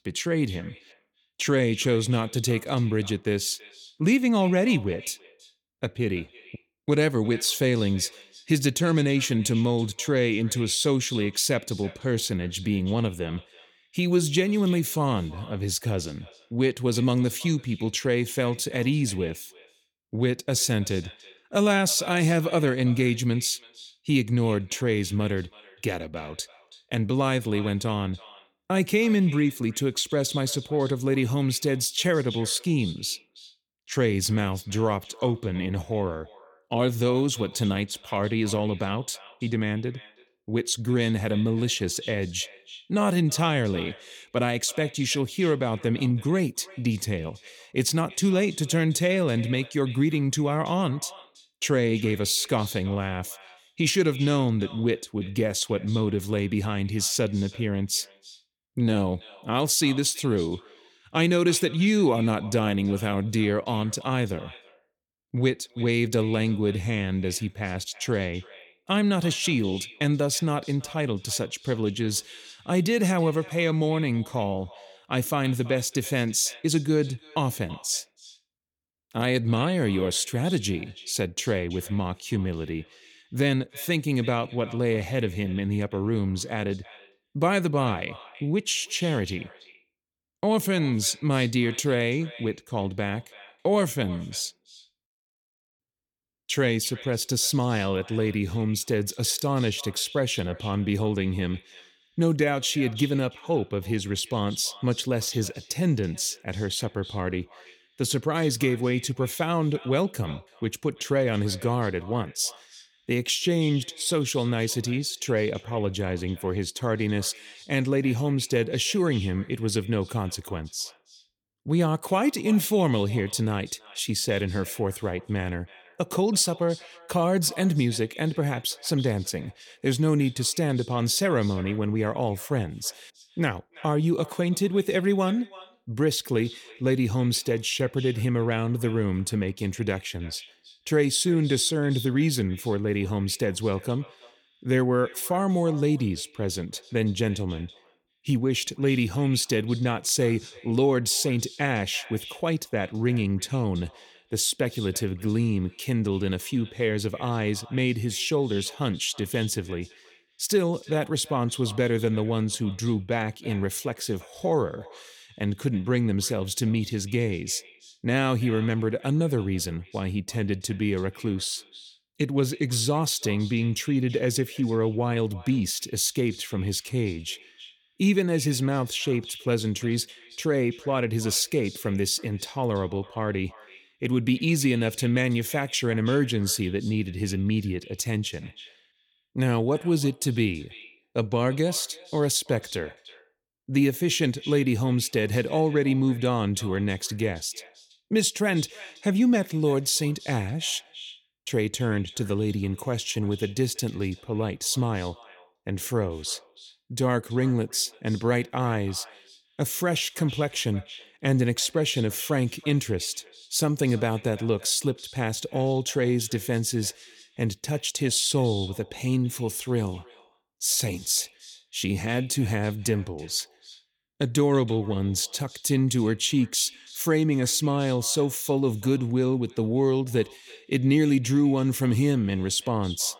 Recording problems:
echo of what is said; faint; throughout; 330 ms later, 20 dB below the speech

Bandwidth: 17.5 kHz